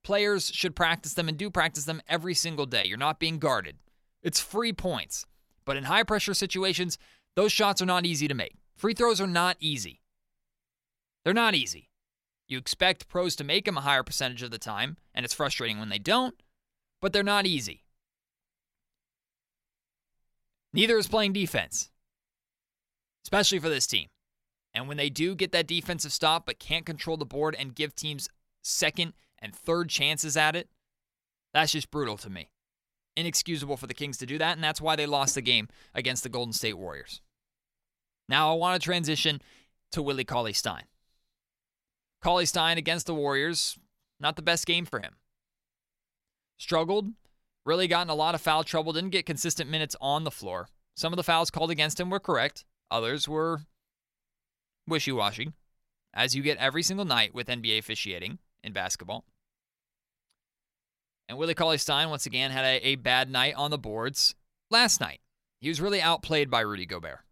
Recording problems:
choppy; occasionally; from 43 to 45 s; 2% of the speech affected

